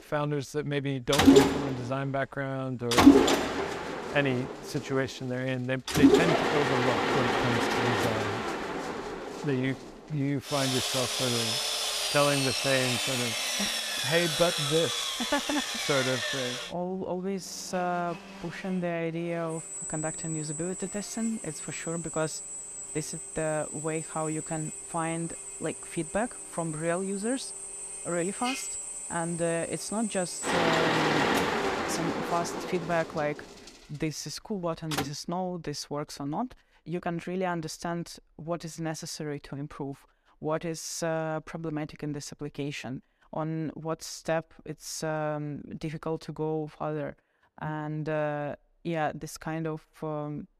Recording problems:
machinery noise; very loud; until 35 s; 4 dB above the speech

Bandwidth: 14.5 kHz